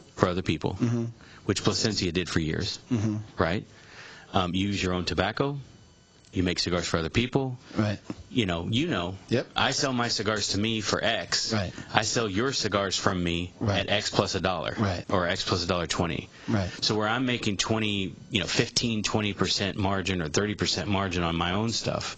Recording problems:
garbled, watery; badly; nothing above 7.5 kHz
squashed, flat; somewhat

